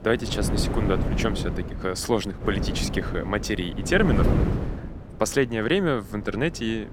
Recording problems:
wind noise on the microphone; heavy; 7 dB below the speech

